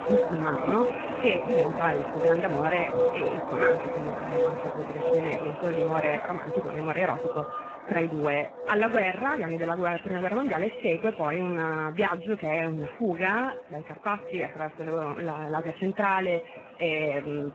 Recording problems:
garbled, watery; badly
animal sounds; loud; throughout; 1 dB below the speech

